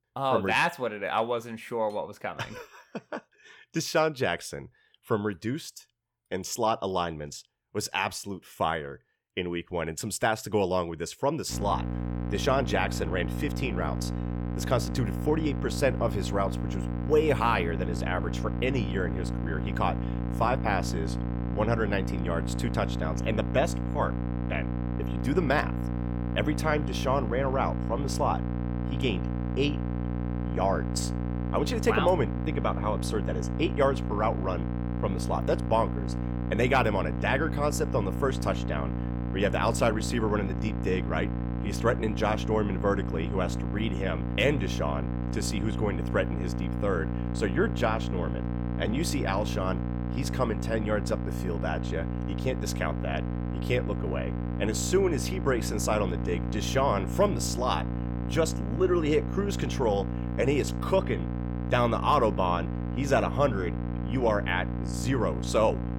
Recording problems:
electrical hum; loud; from 12 s on; 60 Hz, 10 dB below the speech

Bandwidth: 18.5 kHz